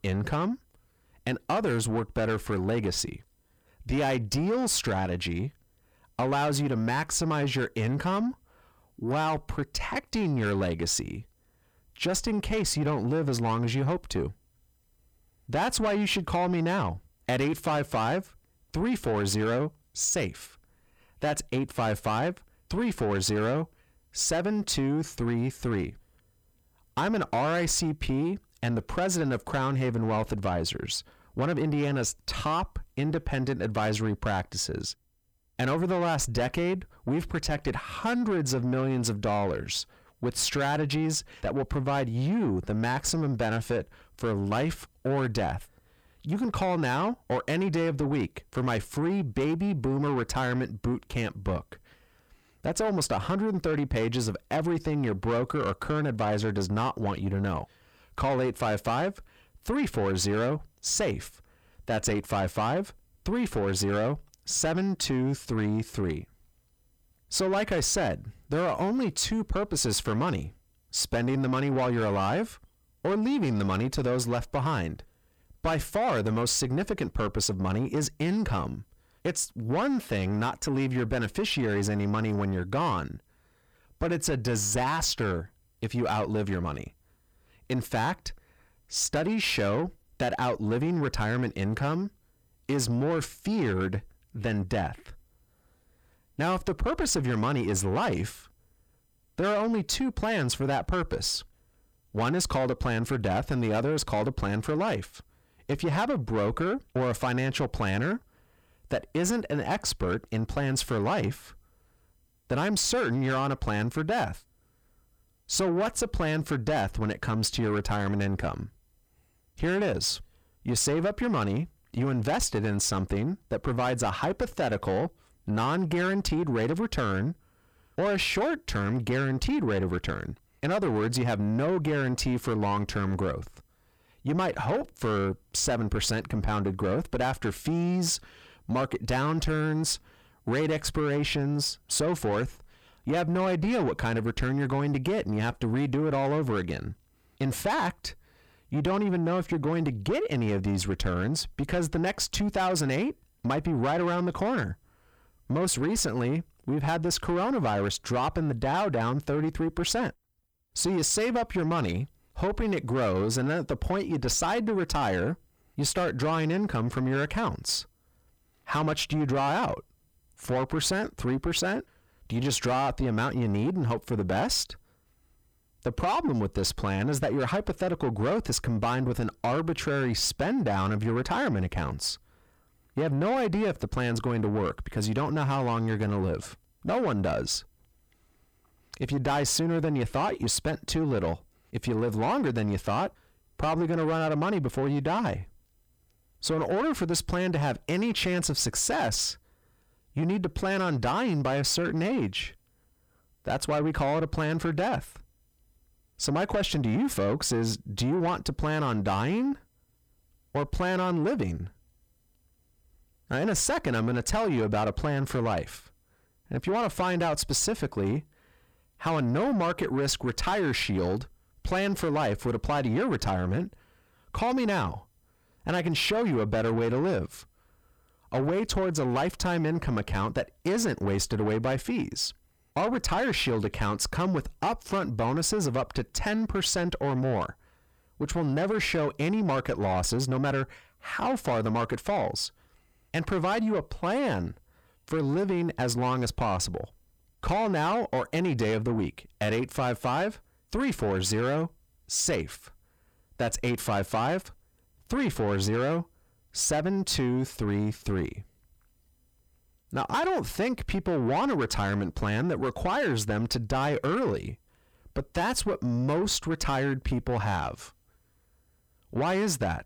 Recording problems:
distortion; slight; 10 dB below the speech

